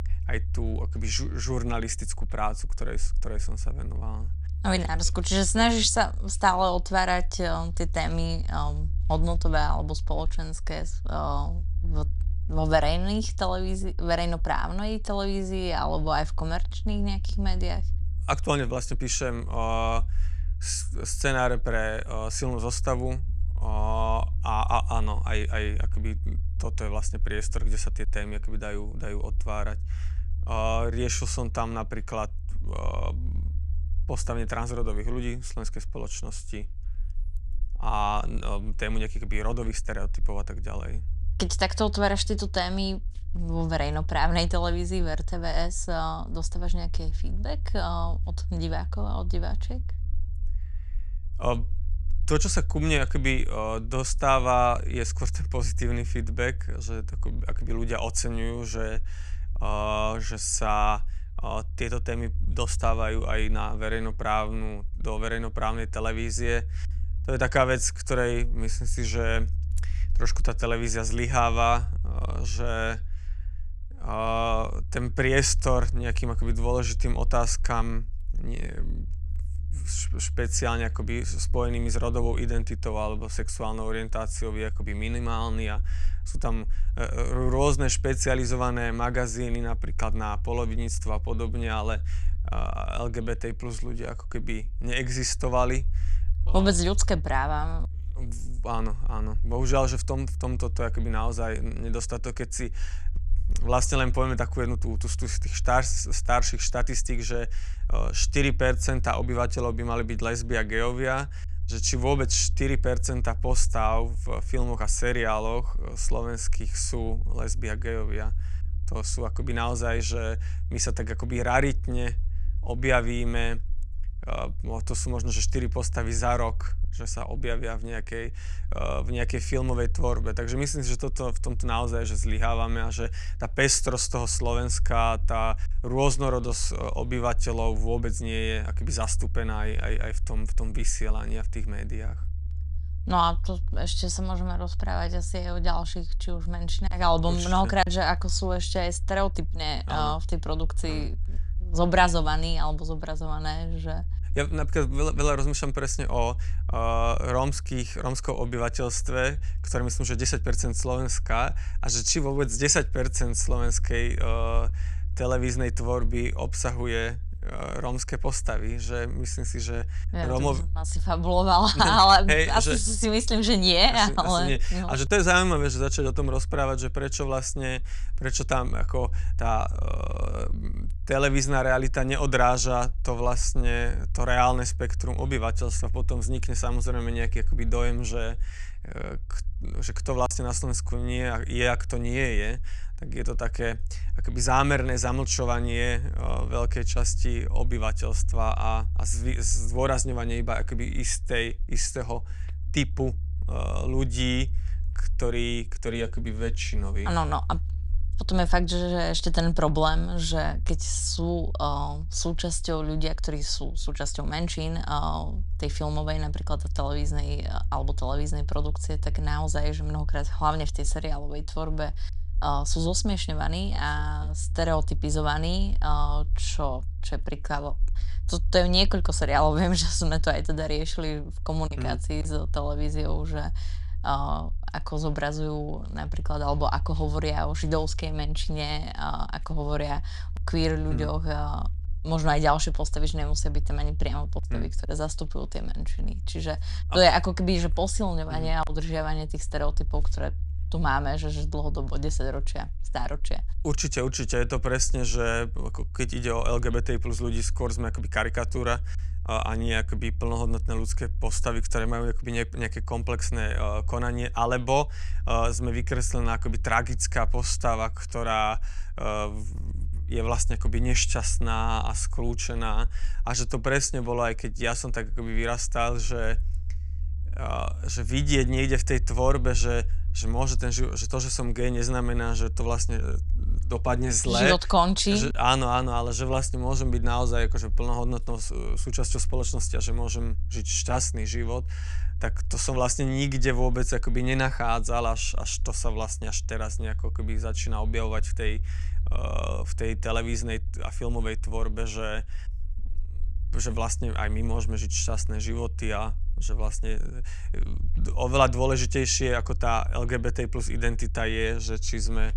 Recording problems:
low rumble; faint; throughout; 25 dB below the speech

